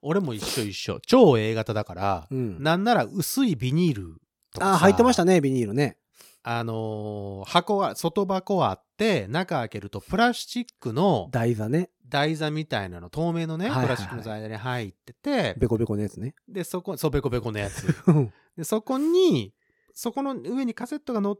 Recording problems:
none

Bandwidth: 17 kHz